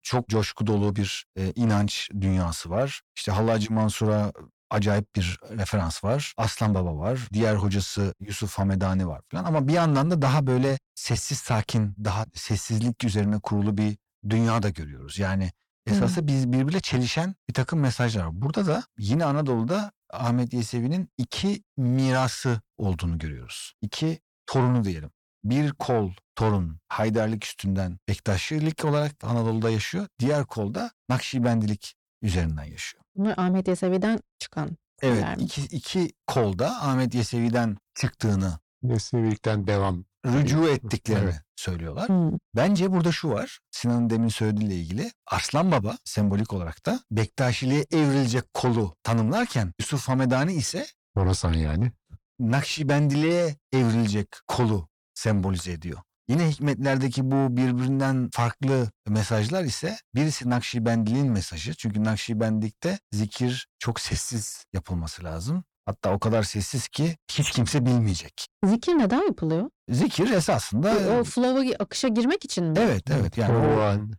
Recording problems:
distortion; slight; 10 dB below the speech

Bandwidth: 18.5 kHz